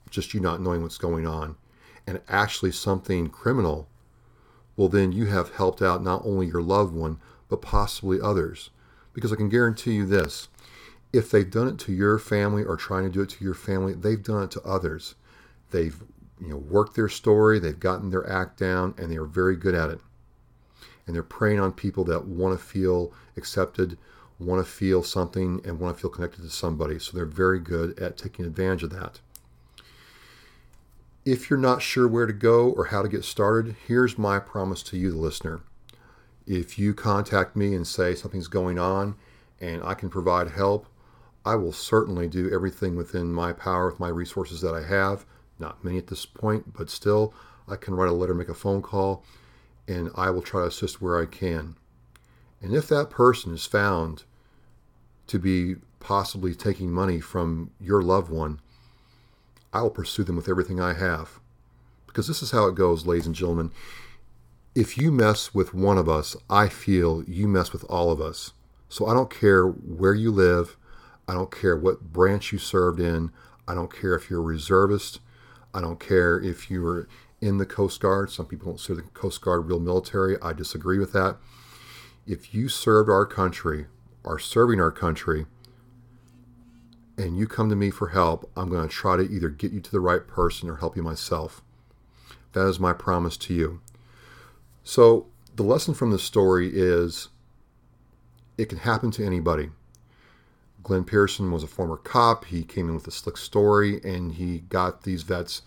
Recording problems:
none

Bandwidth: 18 kHz